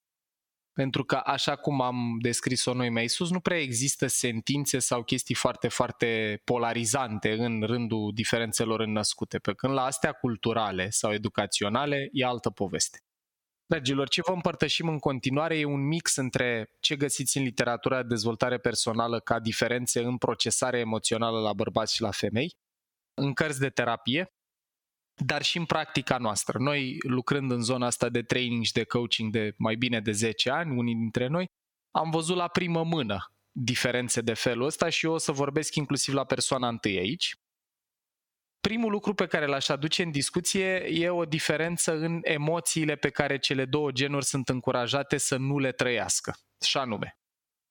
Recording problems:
squashed, flat; somewhat

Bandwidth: 17.5 kHz